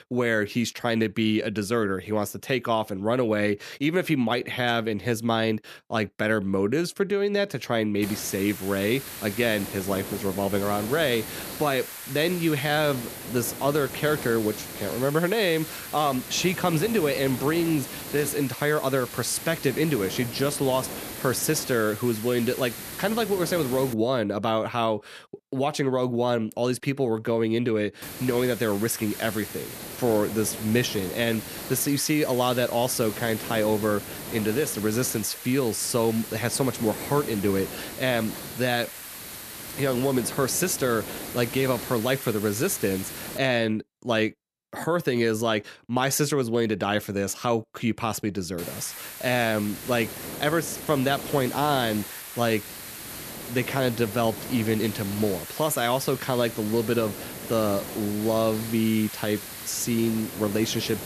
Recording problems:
hiss; loud; from 8 to 24 s, from 28 to 43 s and from 49 s on; 10 dB below the speech

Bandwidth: 14 kHz